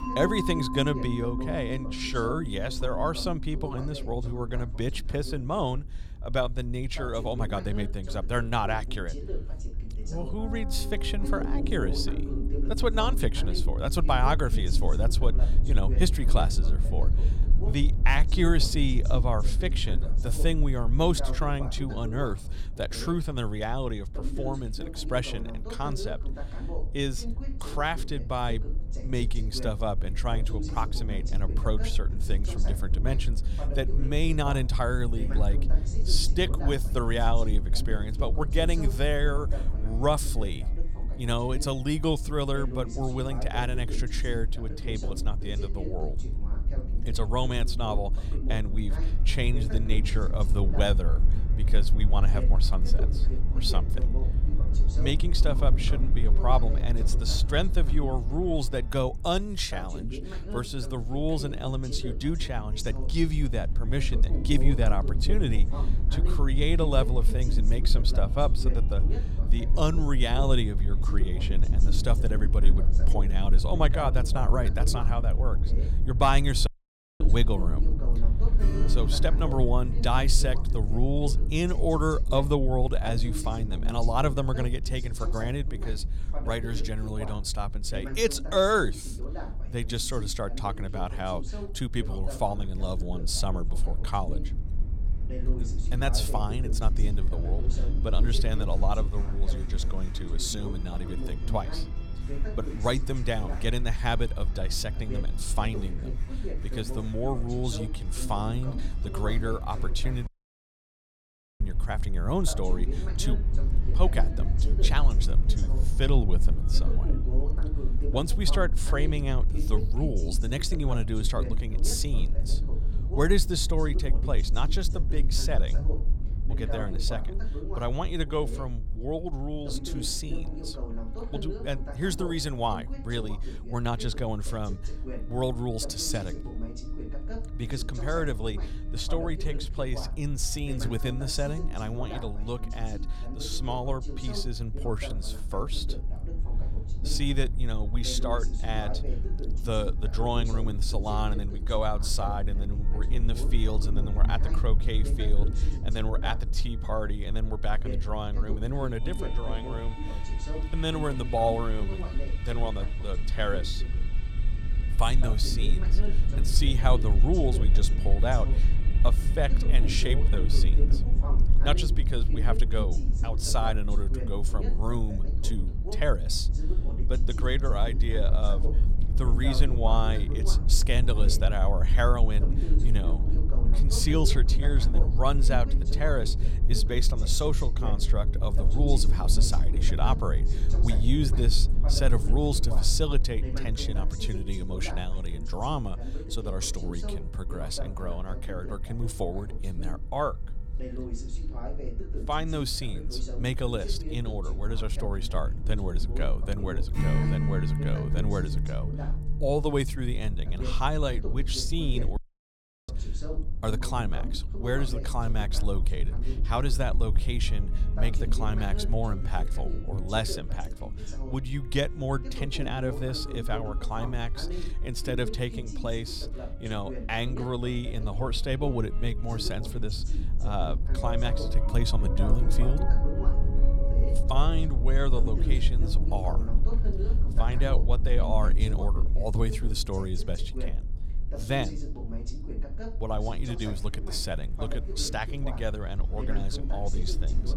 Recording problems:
background music; noticeable; throughout; 10 dB below the speech
voice in the background; noticeable; throughout; 10 dB below the speech
low rumble; noticeable; throughout; 15 dB below the speech
audio cutting out; at 1:17 for 0.5 s, at 1:50 for 1.5 s and at 3:32 for 0.5 s

